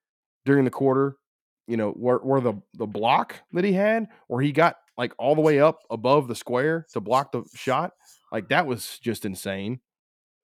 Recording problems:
none

